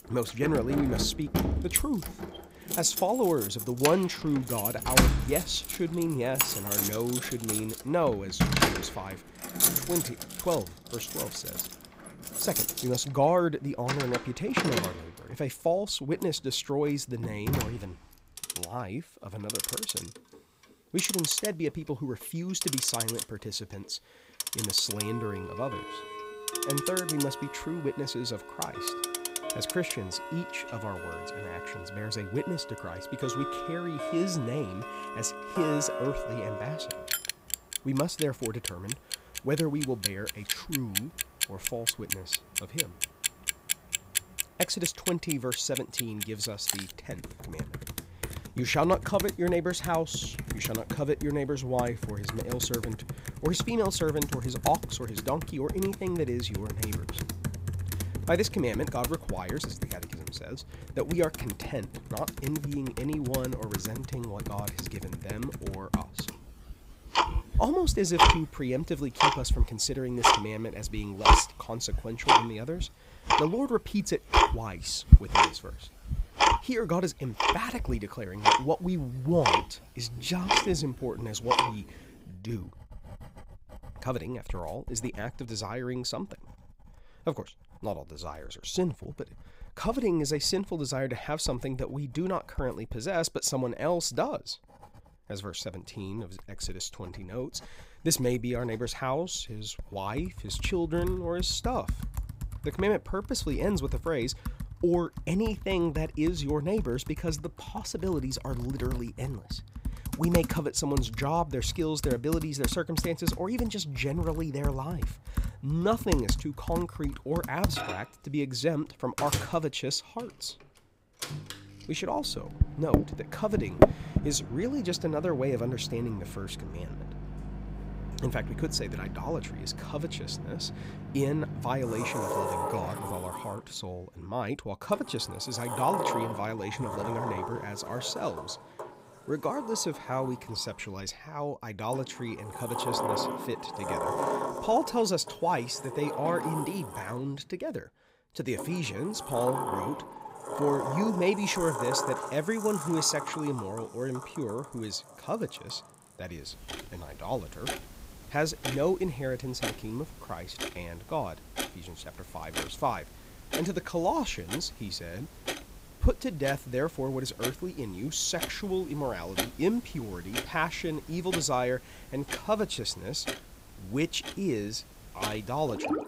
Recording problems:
household noises; loud; throughout; as loud as the speech

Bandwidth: 15.5 kHz